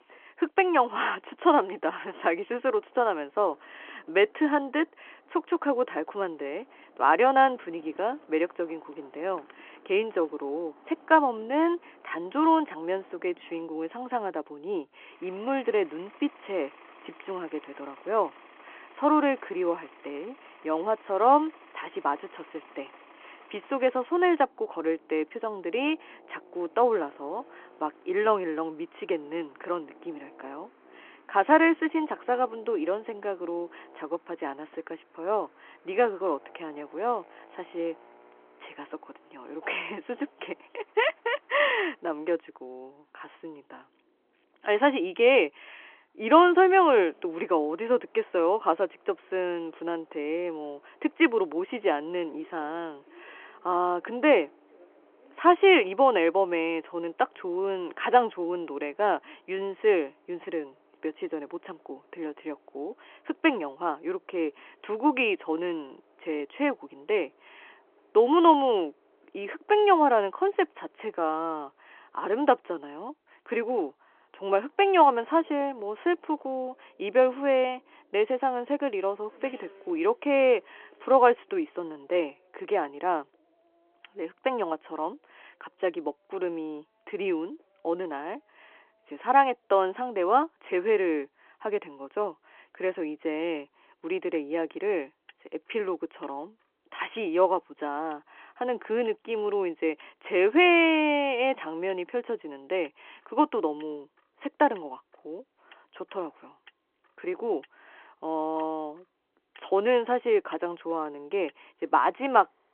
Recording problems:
phone-call audio
traffic noise; faint; throughout; 30 dB below the speech

